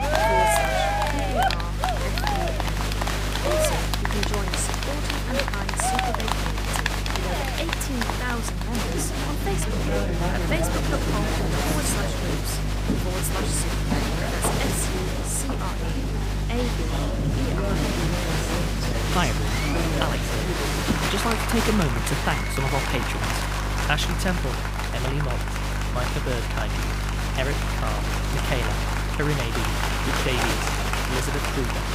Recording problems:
crowd noise; very loud; throughout; 4 dB above the speech
electrical hum; noticeable; throughout; 50 Hz, 10 dB below the speech

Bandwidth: 15.5 kHz